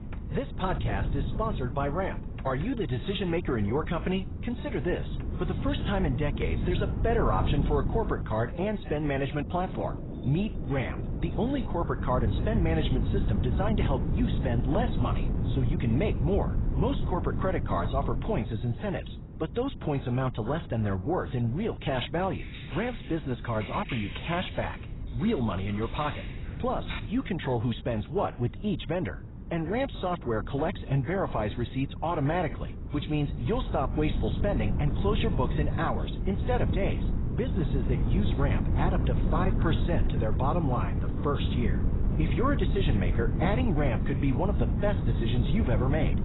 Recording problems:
garbled, watery; badly; nothing above 4 kHz
rain or running water; noticeable; throughout; 15 dB below the speech
wind noise on the microphone; occasional gusts; 10 dB below the speech
jangling keys; very faint; from 10 to 11 s; peak 30 dB below the speech
keyboard typing; noticeable; from 22 to 27 s; peak 8 dB below the speech

